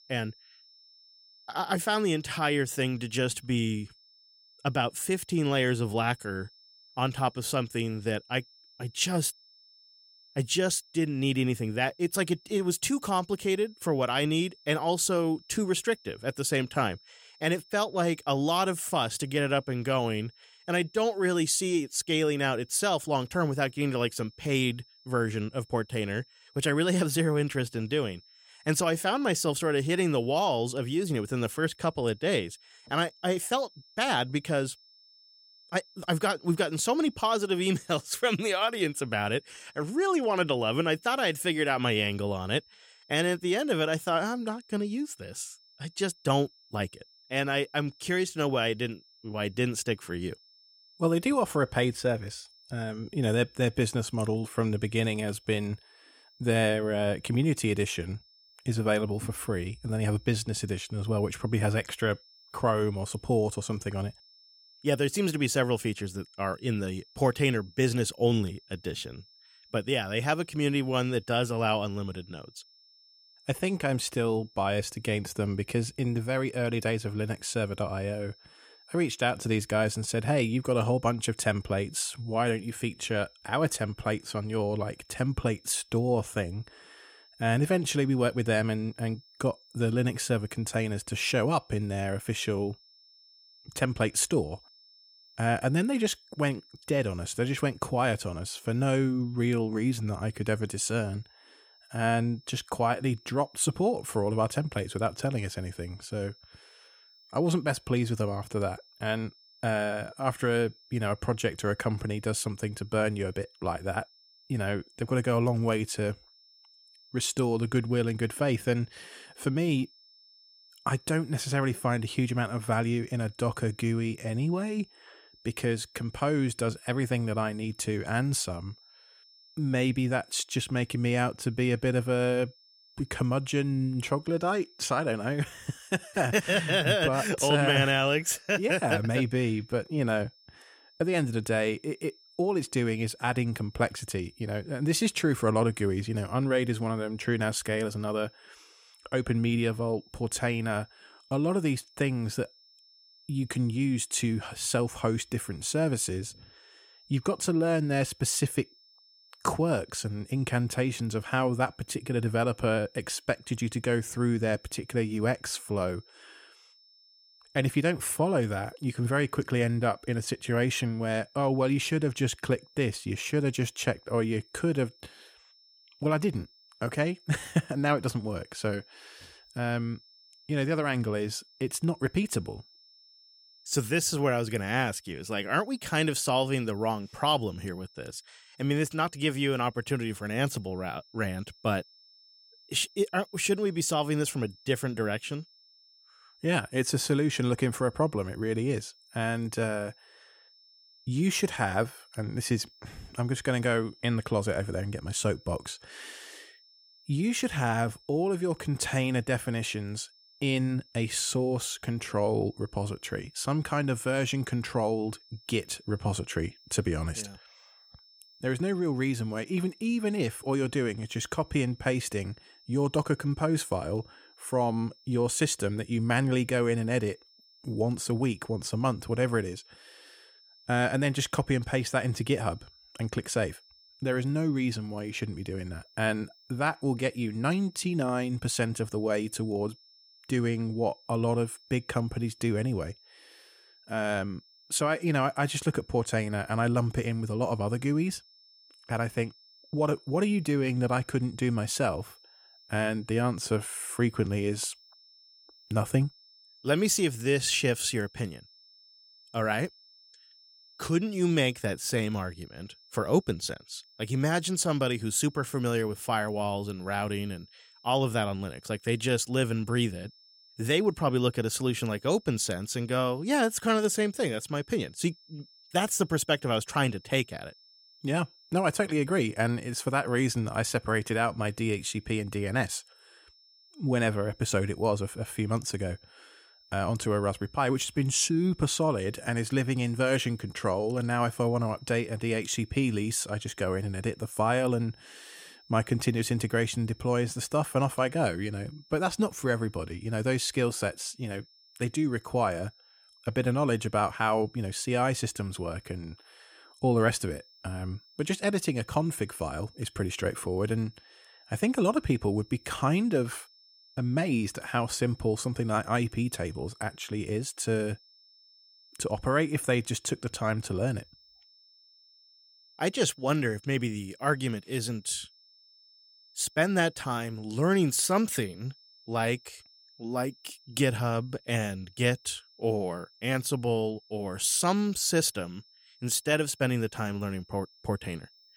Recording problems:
high-pitched whine; faint; throughout; 5.5 kHz, 25 dB below the speech

